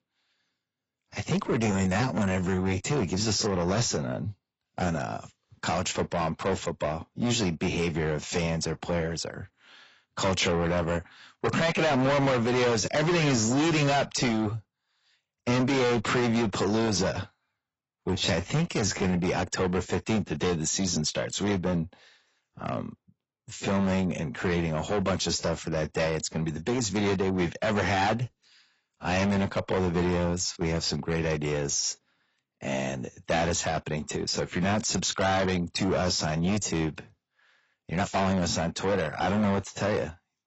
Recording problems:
distortion; heavy; 5 dB below the speech
garbled, watery; badly; nothing above 7.5 kHz
uneven, jittery; strongly; from 1.5 to 38 s

